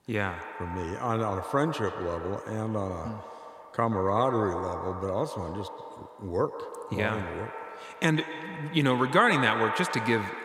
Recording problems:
echo of what is said; strong; throughout; 130 ms later, 8 dB below the speech

